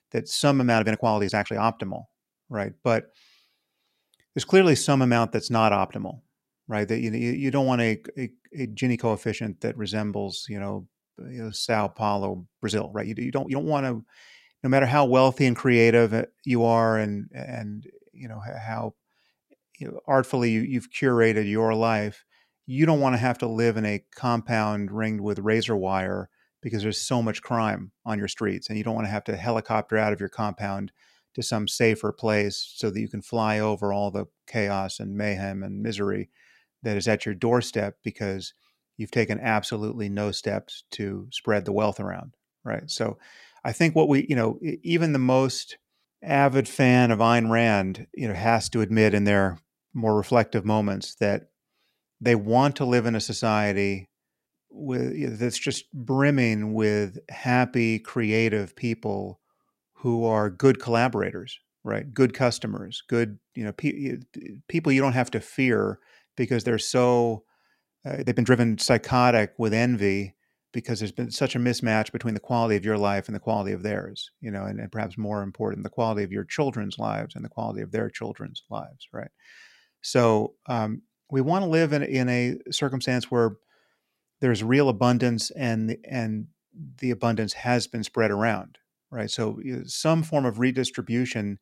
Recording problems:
uneven, jittery; strongly; from 1 s to 1:09

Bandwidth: 16 kHz